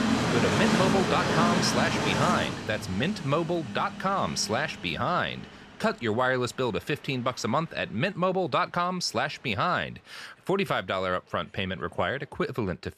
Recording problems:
train or aircraft noise; loud; throughout; as loud as the speech

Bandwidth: 14 kHz